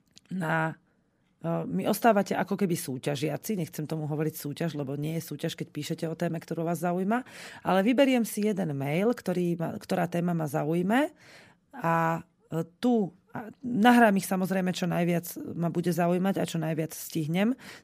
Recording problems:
none

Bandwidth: 15 kHz